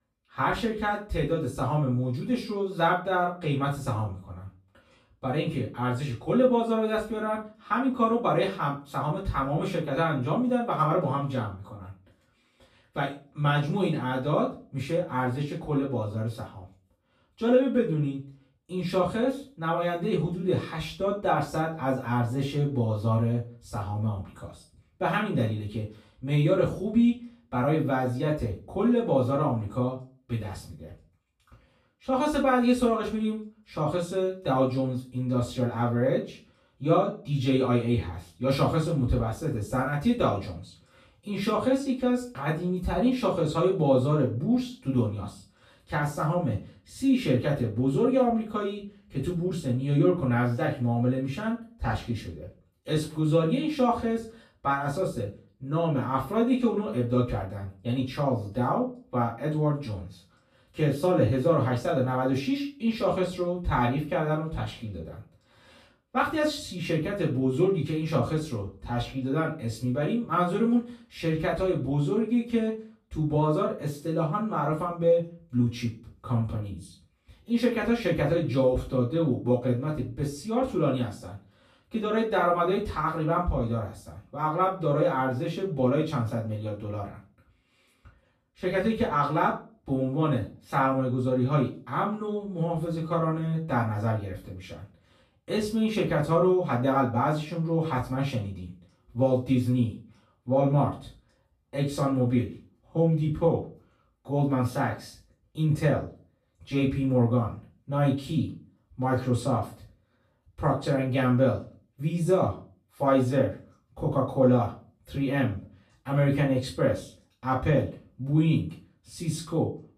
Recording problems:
off-mic speech; far
room echo; slight; dies away in 0.3 s

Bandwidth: 14.5 kHz